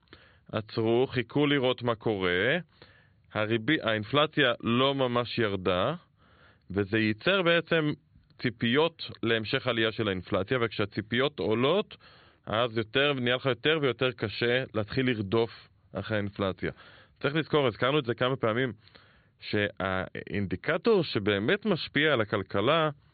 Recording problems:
high frequencies cut off; severe; nothing above 4.5 kHz

